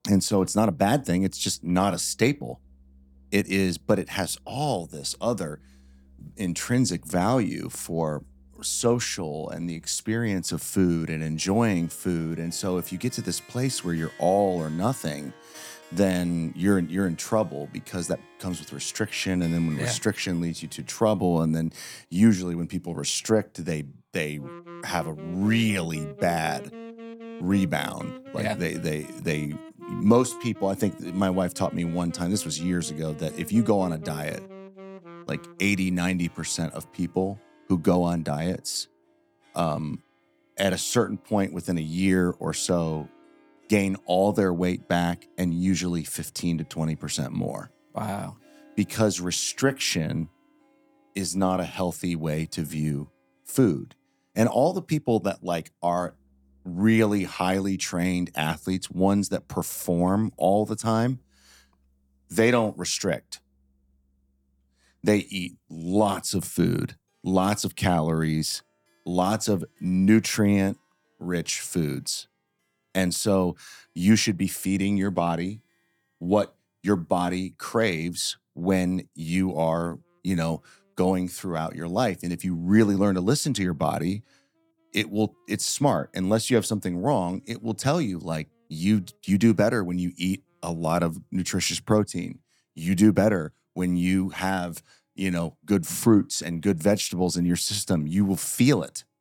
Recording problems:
background music; faint; throughout; 20 dB below the speech

